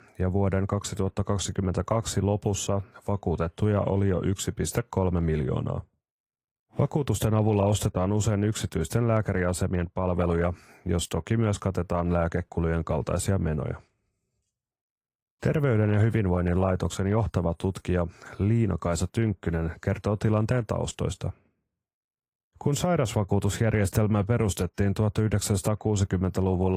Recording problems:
garbled, watery; slightly; nothing above 14.5 kHz
abrupt cut into speech; at the end

